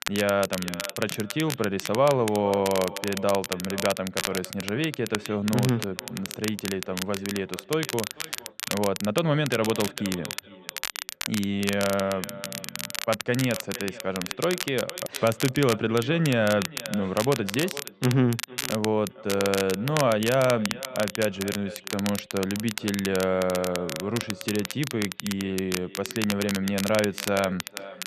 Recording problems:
muffled; very; fading above 3 kHz
echo of what is said; noticeable; throughout; 460 ms later, 15 dB below the speech
crackle, like an old record; loud; 7 dB below the speech

